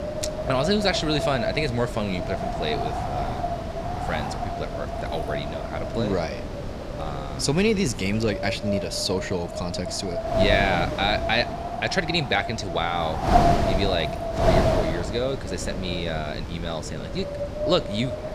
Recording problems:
wind noise on the microphone; heavy; 1 dB below the speech
background chatter; faint; throughout; 3 voices, 25 dB below the speech

